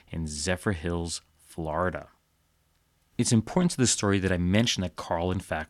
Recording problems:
none

